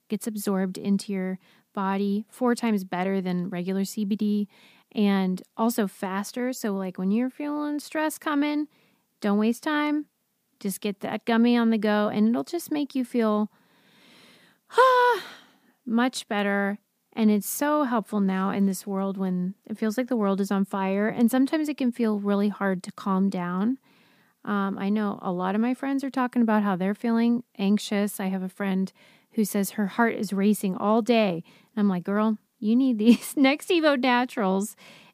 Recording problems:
none

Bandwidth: 15 kHz